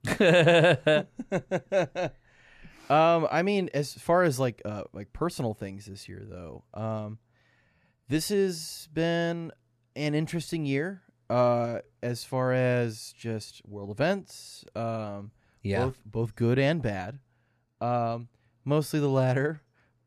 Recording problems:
none

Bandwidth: 14 kHz